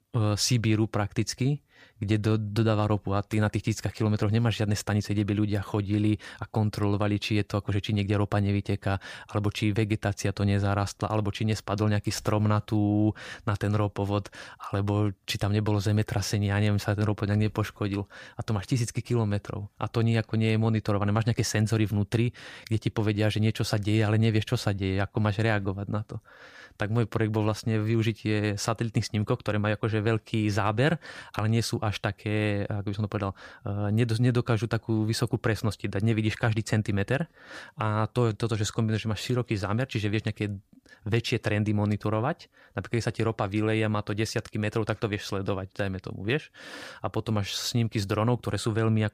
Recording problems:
none

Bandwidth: 15 kHz